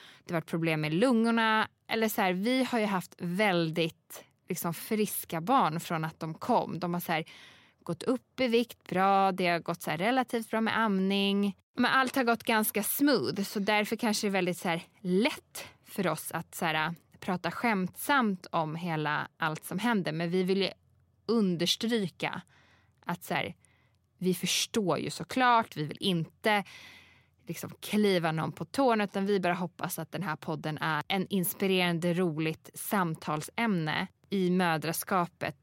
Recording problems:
none

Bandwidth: 16 kHz